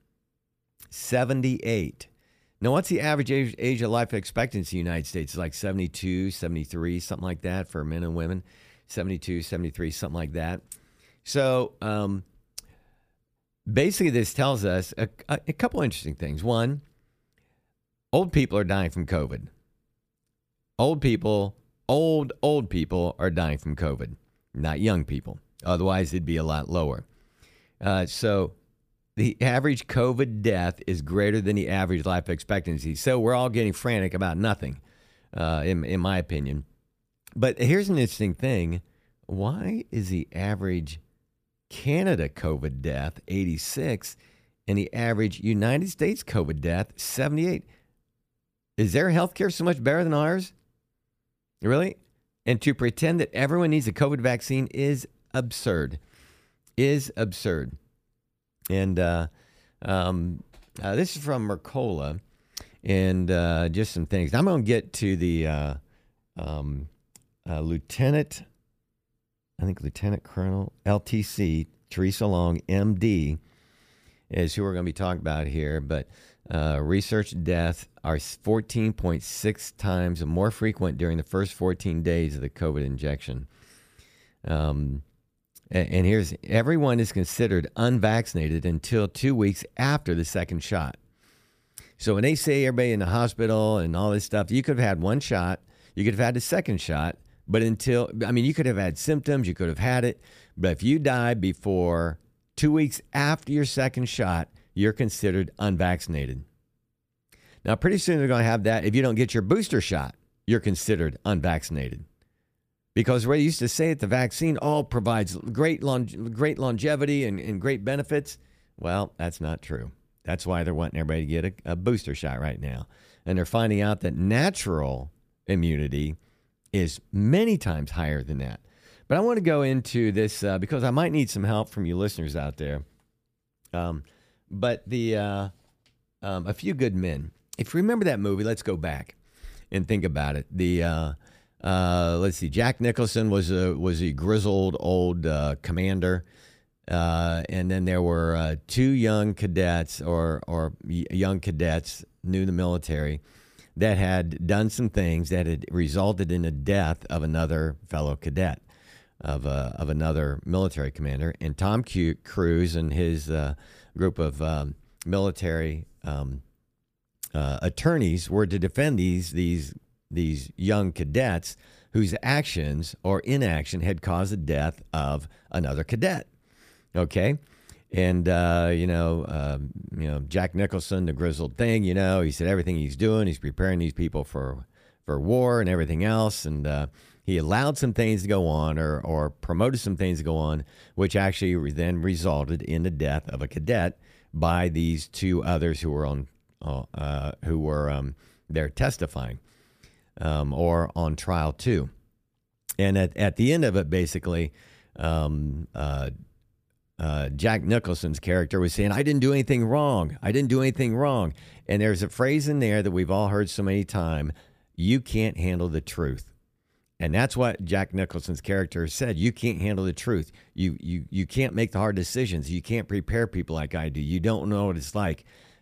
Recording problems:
none

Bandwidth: 15 kHz